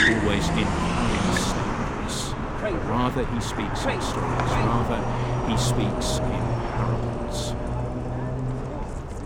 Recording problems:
traffic noise; very loud; throughout; 4 dB above the speech

